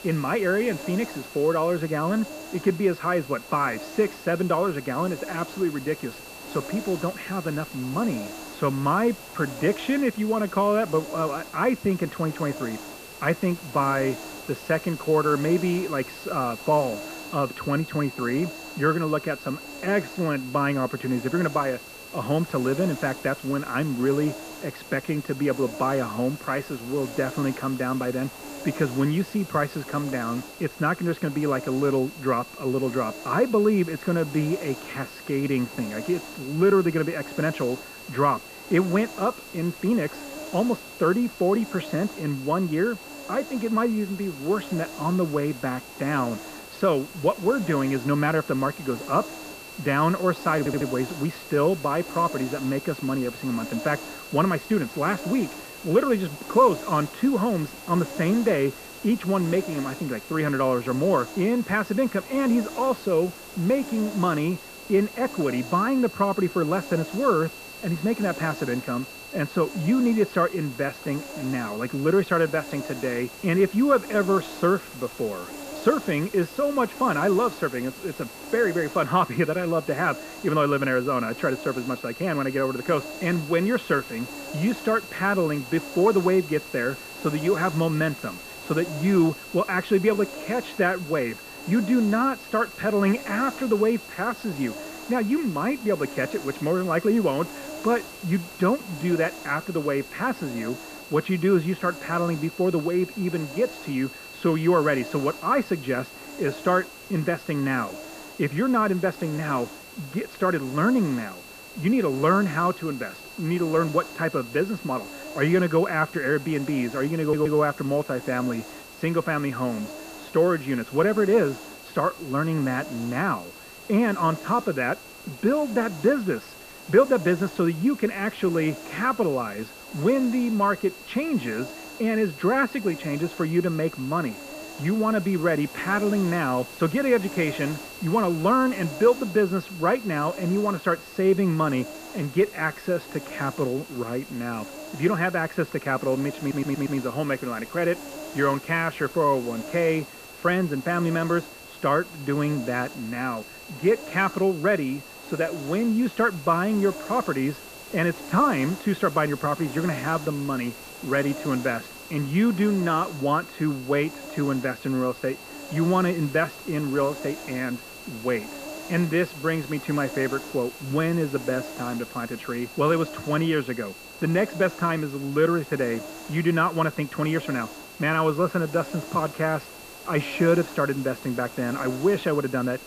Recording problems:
muffled; very; fading above 2 kHz
high-pitched whine; noticeable; throughout; 2.5 kHz, 20 dB below the speech
hiss; noticeable; throughout; 15 dB below the speech
audio stuttering; at 51 s, at 1:57 and at 2:26

